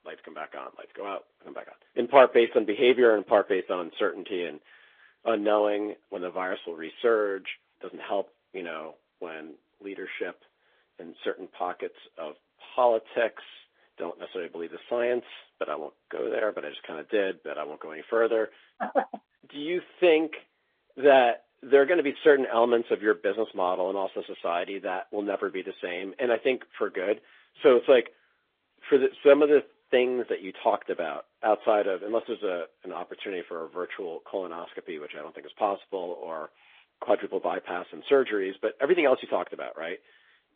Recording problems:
phone-call audio; nothing above 3.5 kHz
garbled, watery; slightly

